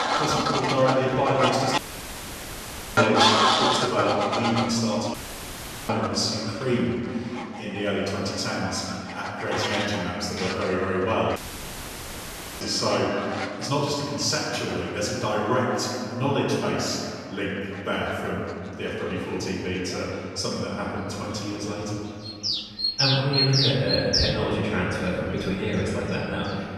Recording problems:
room echo; strong; dies away in 2.2 s
off-mic speech; far
animal sounds; very loud; throughout; 1 dB above the speech
audio cutting out; filled with static; at 2 s for 1 s, at 5 s for 1 s and at 11 s for 1.5 s

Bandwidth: 13.5 kHz